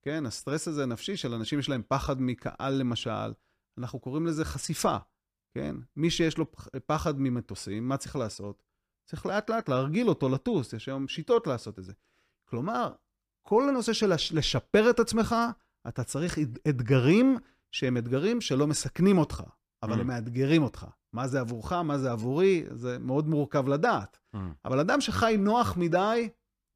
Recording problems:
none

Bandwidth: 15 kHz